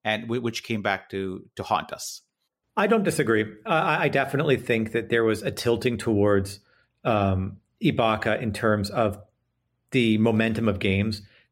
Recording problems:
none

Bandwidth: 16 kHz